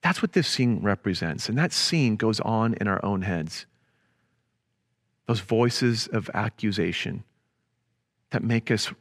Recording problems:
none

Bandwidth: 14.5 kHz